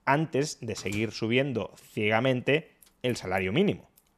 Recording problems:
household noises; faint; throughout; 20 dB below the speech

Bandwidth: 14 kHz